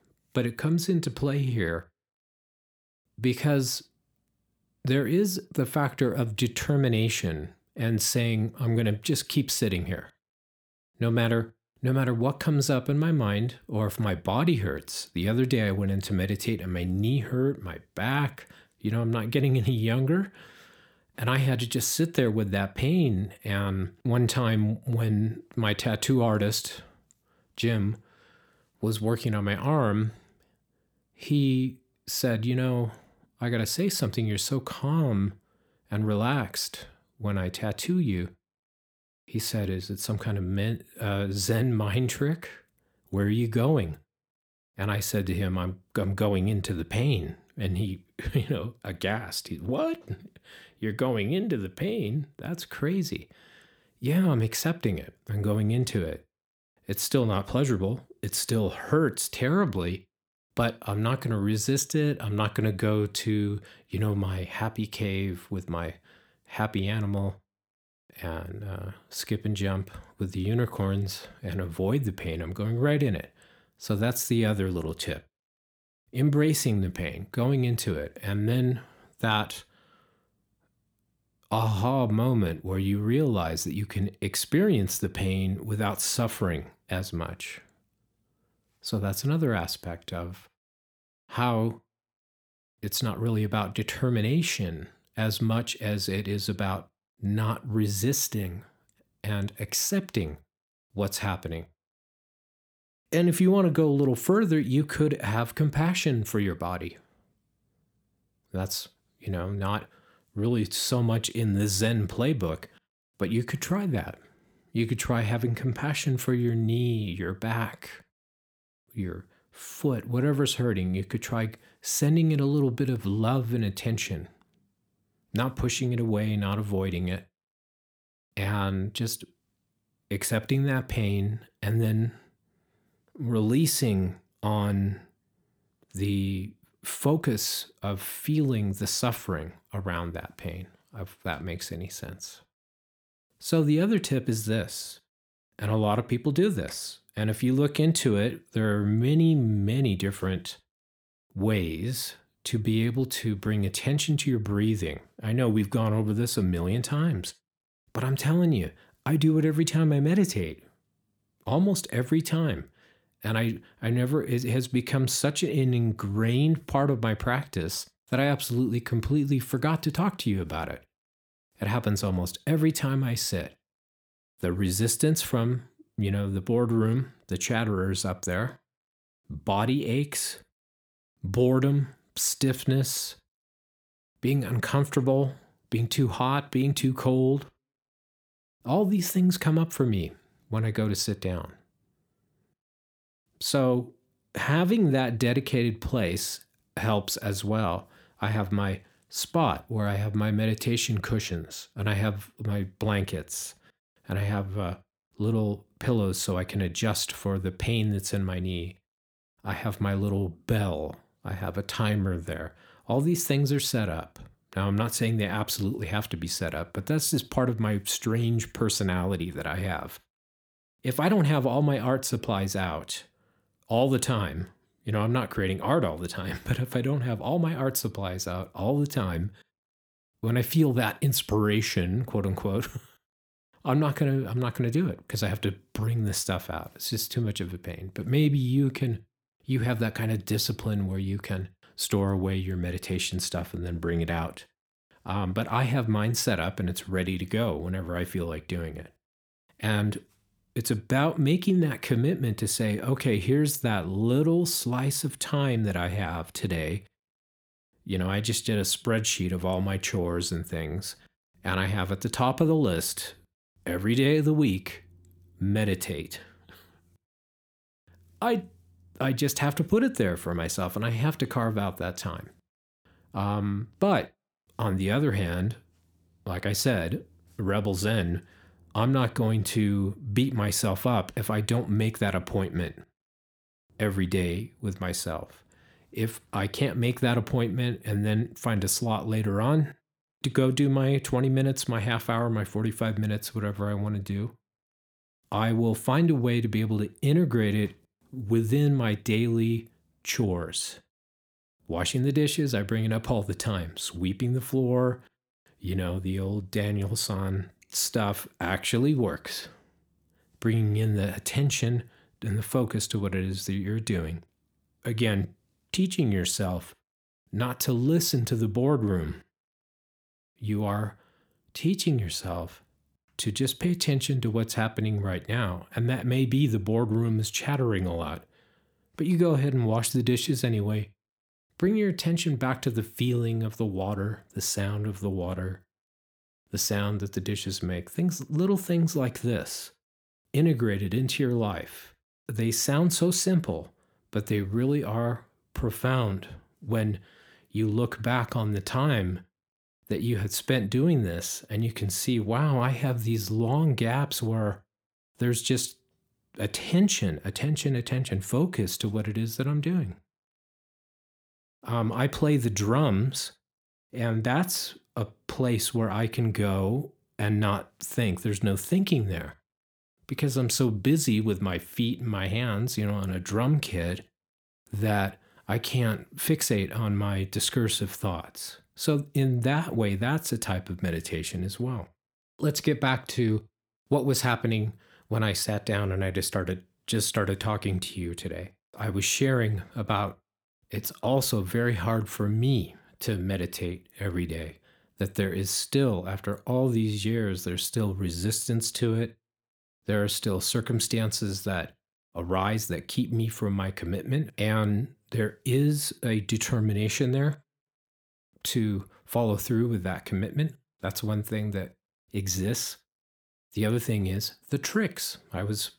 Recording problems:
none

